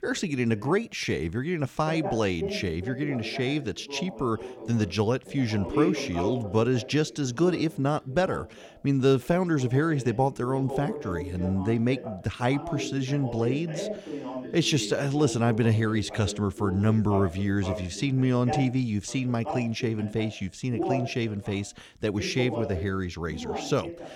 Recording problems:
voice in the background; loud; throughout; 9 dB below the speech

